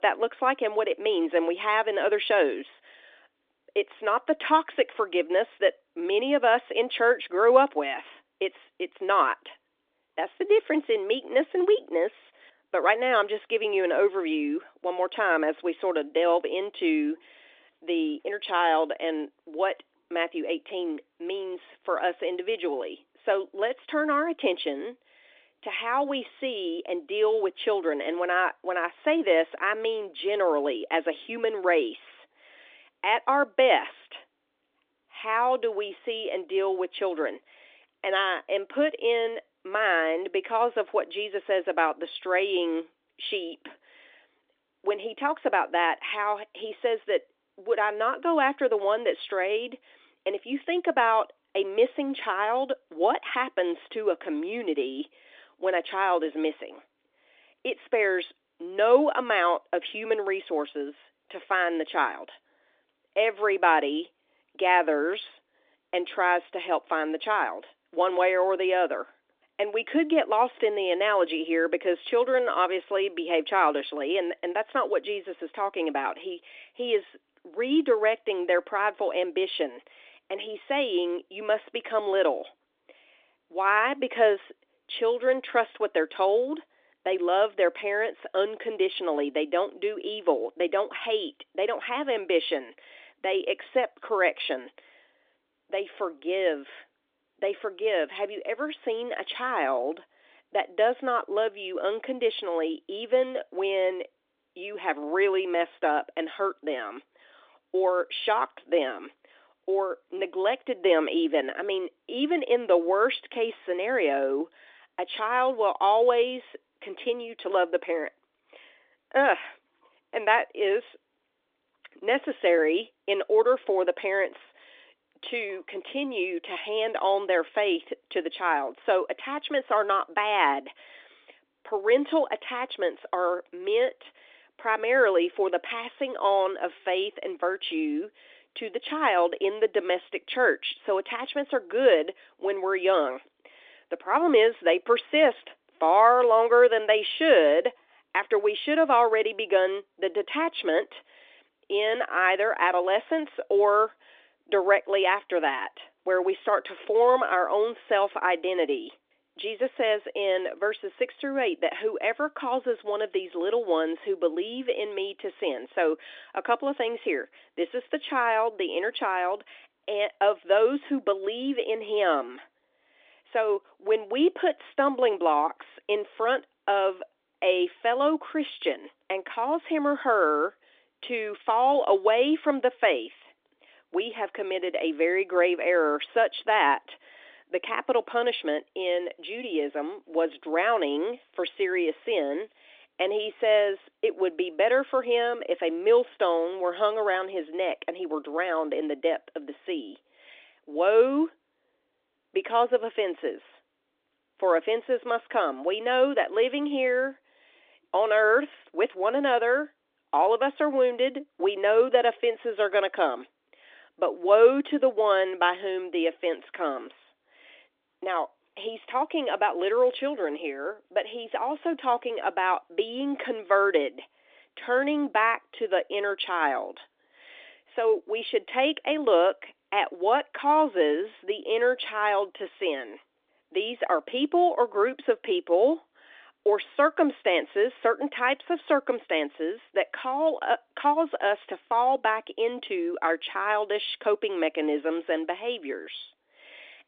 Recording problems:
phone-call audio; nothing above 3 kHz

